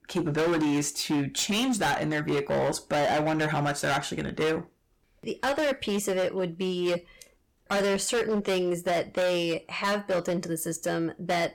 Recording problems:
distortion; heavy; 19% of the sound clipped

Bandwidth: 17.5 kHz